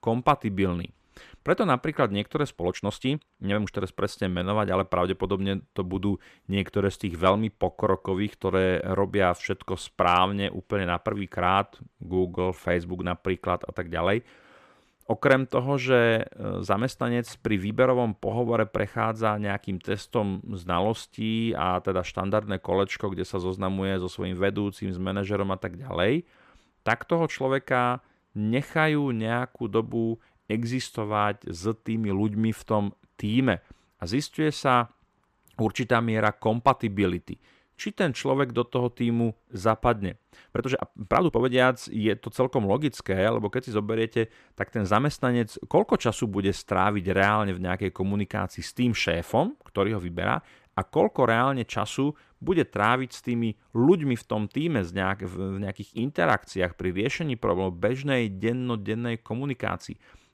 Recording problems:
uneven, jittery; strongly; from 2.5 to 42 s

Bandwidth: 14.5 kHz